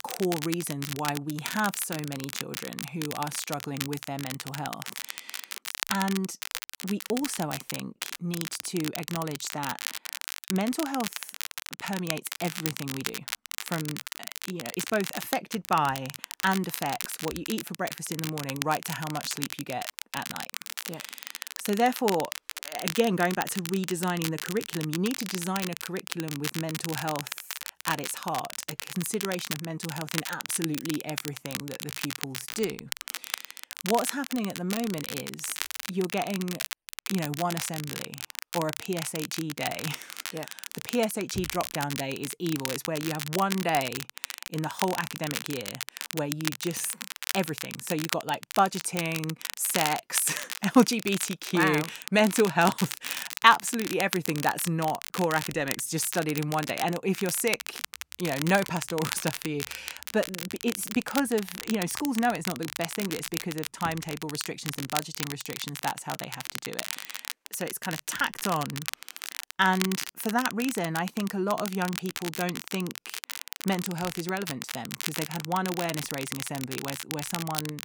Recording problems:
crackle, like an old record; loud; 5 dB below the speech

